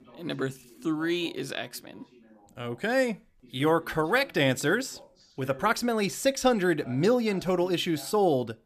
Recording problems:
voice in the background; faint; throughout; 25 dB below the speech

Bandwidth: 14.5 kHz